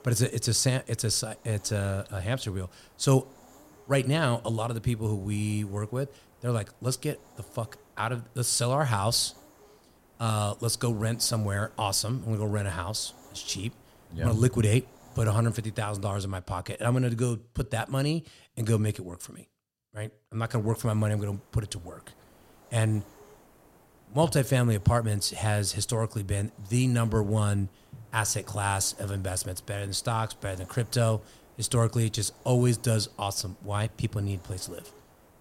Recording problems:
hiss; faint; until 16 s and from 20 s on; 25 dB below the speech

